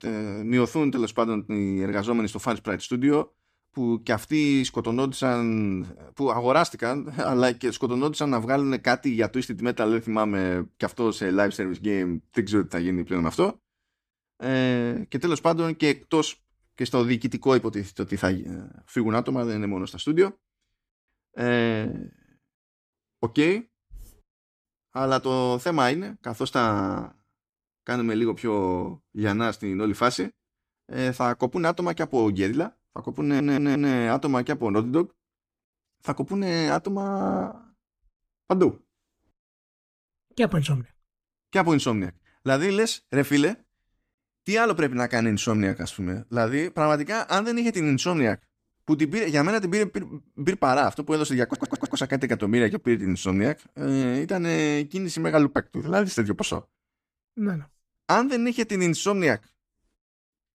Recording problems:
audio stuttering; at 33 s and at 51 s

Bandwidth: 14.5 kHz